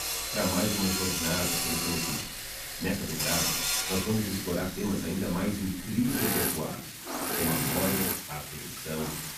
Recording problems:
off-mic speech; far
room echo; noticeable; dies away in 0.5 s
machinery noise; very loud; throughout; 3 dB above the speech
hiss; loud; throughout; 7 dB below the speech
uneven, jittery; strongly; from 1 to 9 s

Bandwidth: 14.5 kHz